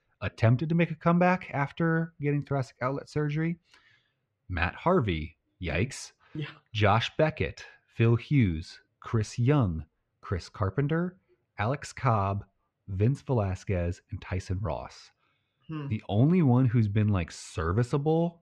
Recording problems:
muffled; slightly; fading above 3 kHz

